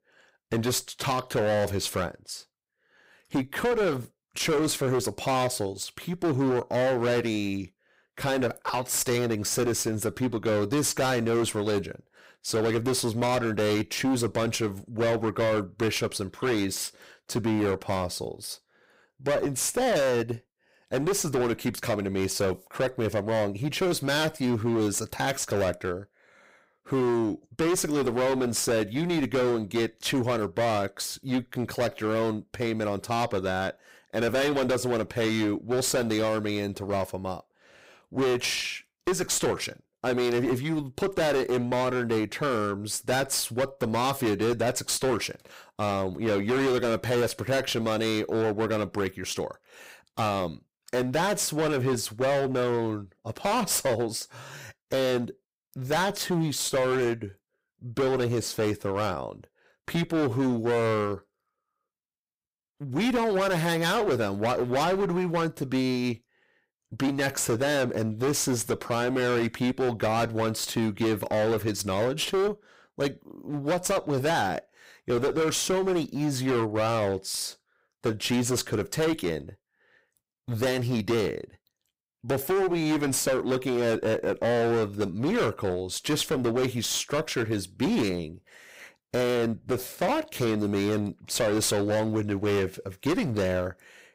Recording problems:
distortion; heavy; 19% of the sound clipped

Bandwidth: 15.5 kHz